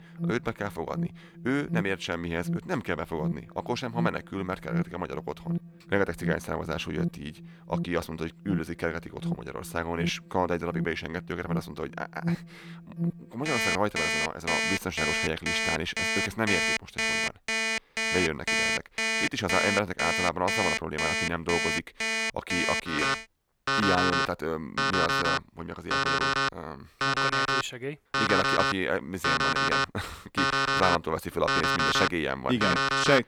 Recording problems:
alarms or sirens; very loud; throughout; 3 dB above the speech

